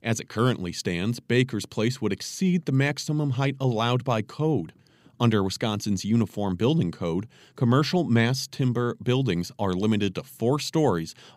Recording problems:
none

